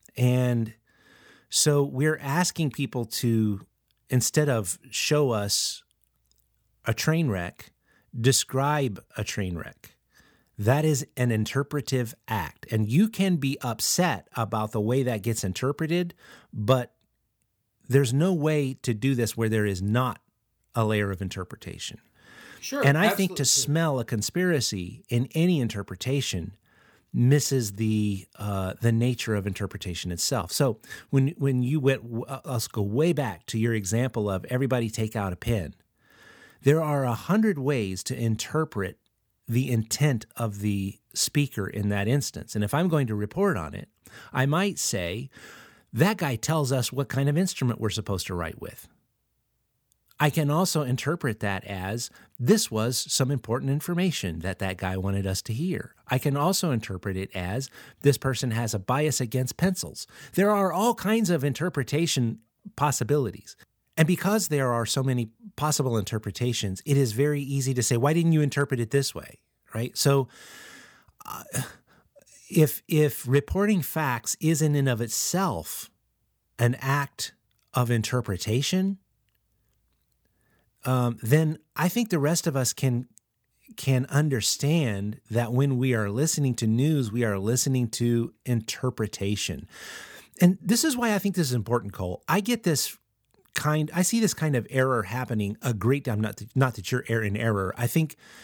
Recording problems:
none

